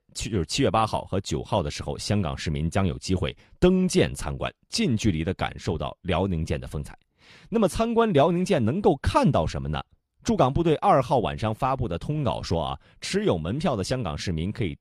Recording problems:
none

